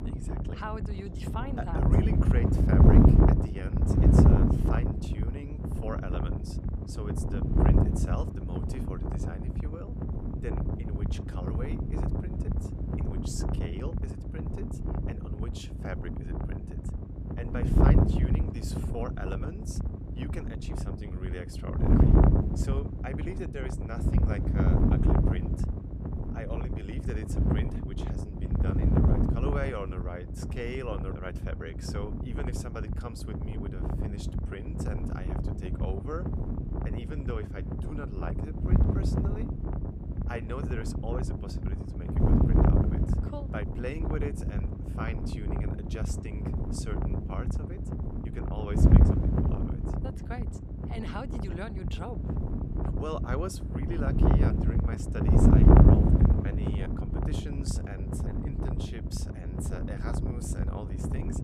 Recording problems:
wind noise on the microphone; heavy; 5 dB above the speech

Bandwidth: 15.5 kHz